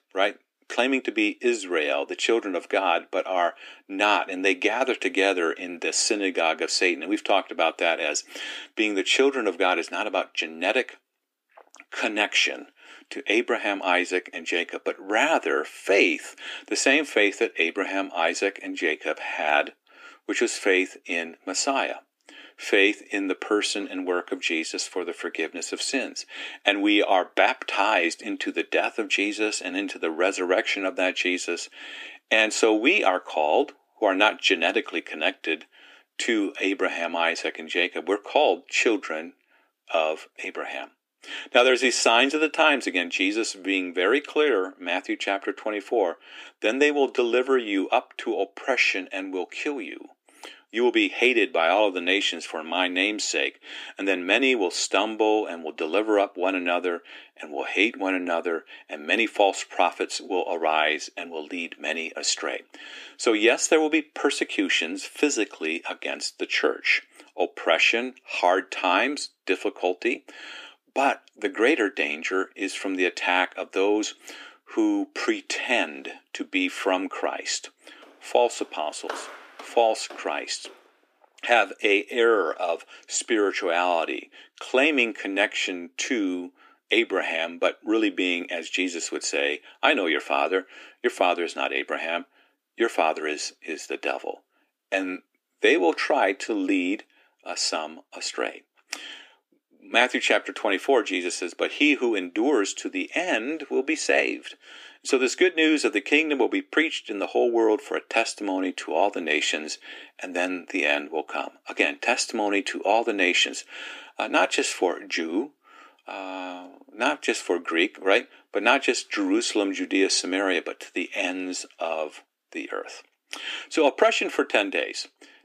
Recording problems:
thin; somewhat; fading below 250 Hz
footsteps; faint; from 1:18 to 1:21; peak 10 dB below the speech

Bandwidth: 15 kHz